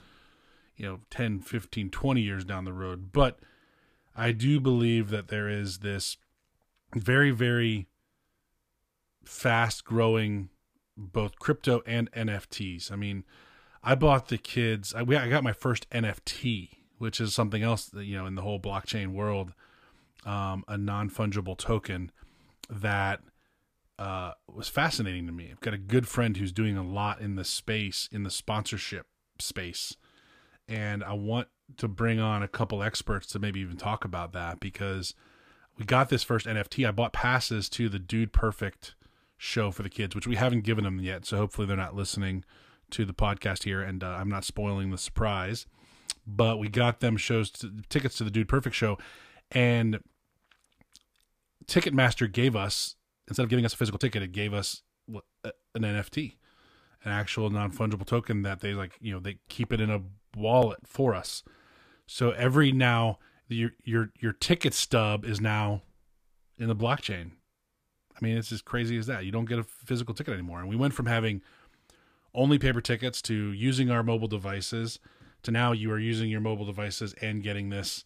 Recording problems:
uneven, jittery; strongly; from 0.5 s to 1:16

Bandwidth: 15 kHz